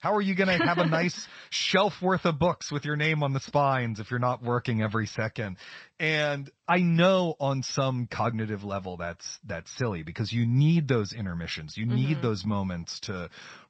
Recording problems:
garbled, watery; slightly

